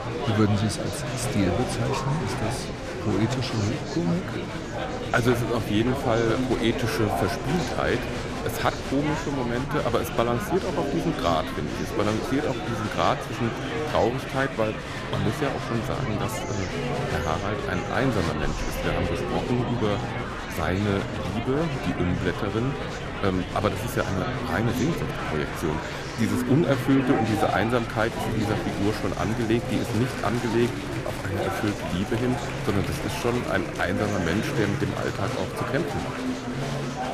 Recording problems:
murmuring crowd; loud; throughout; 3 dB below the speech
wind noise on the microphone; occasional gusts; 15 dB below the speech

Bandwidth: 15 kHz